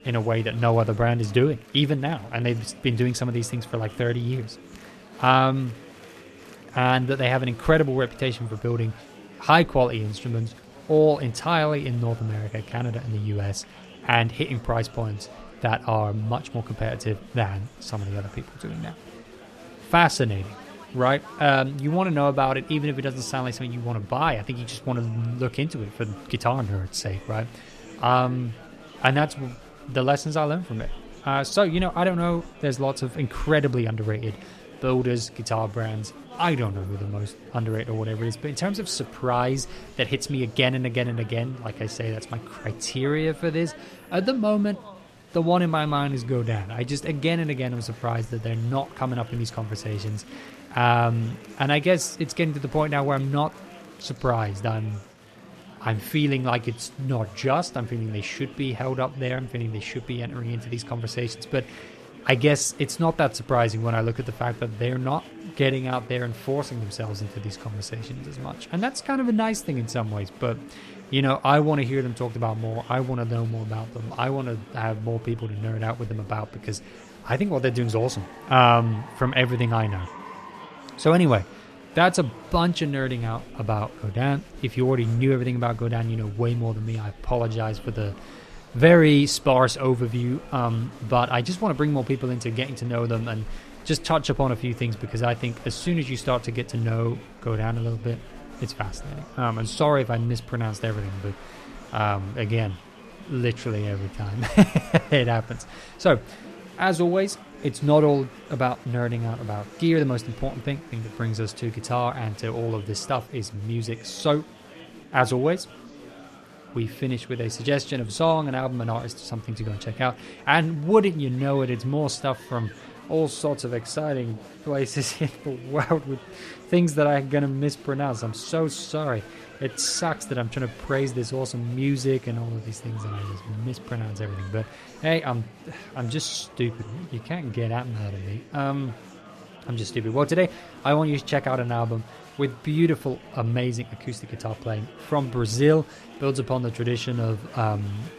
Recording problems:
murmuring crowd; noticeable; throughout; 20 dB below the speech

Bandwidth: 14 kHz